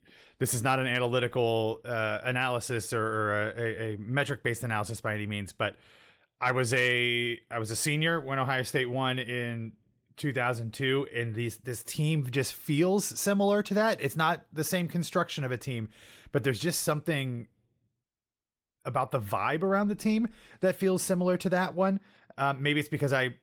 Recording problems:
garbled, watery; slightly; nothing above 16.5 kHz

